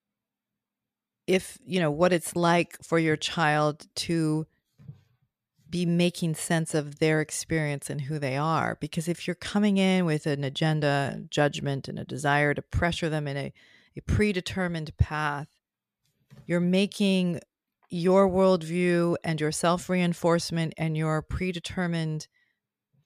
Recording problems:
none

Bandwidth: 14 kHz